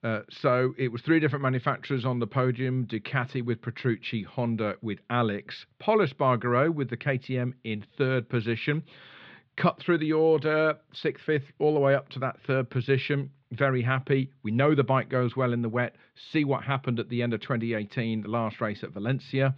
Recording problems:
muffled; slightly; fading above 3.5 kHz

